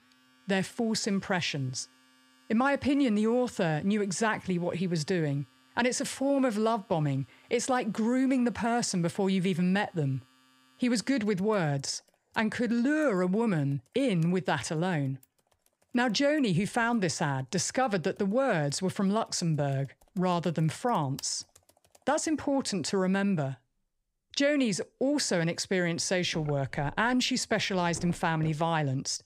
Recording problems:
household noises; faint; throughout; 30 dB below the speech

